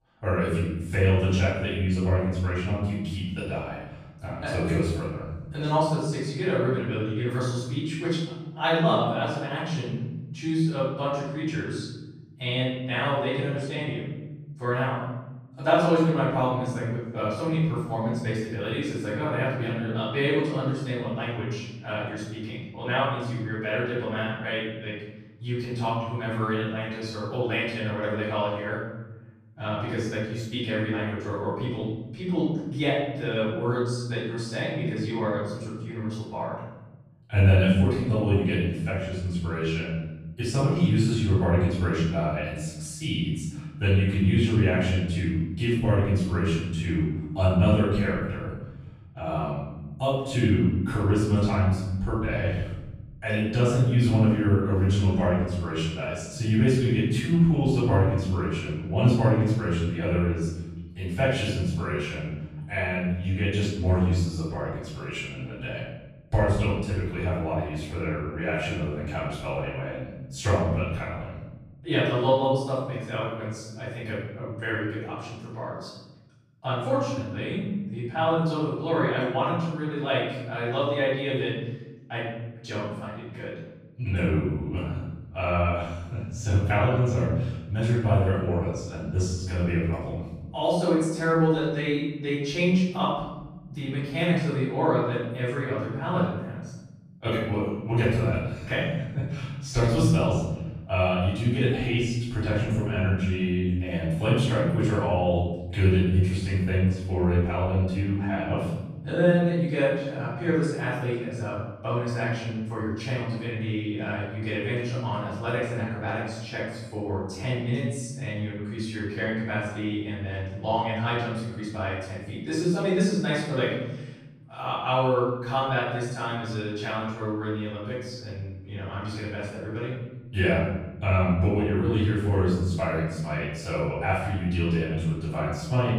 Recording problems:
room echo; strong; dies away in 1.3 s
off-mic speech; far

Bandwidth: 15 kHz